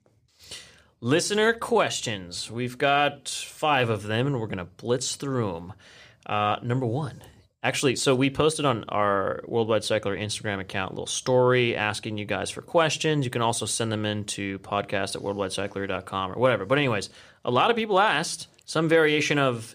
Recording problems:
none

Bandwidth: 14.5 kHz